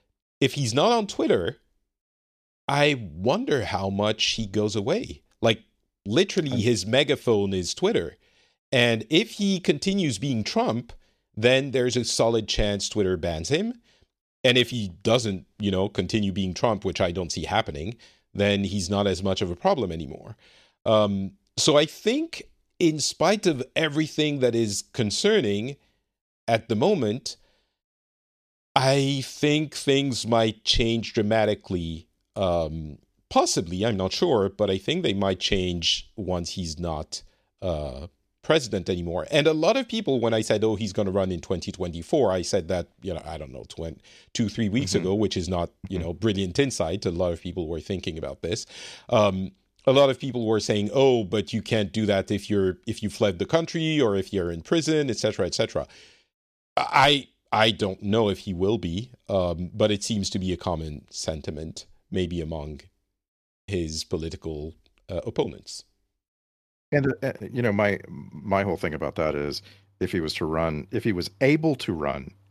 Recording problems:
none

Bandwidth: 14.5 kHz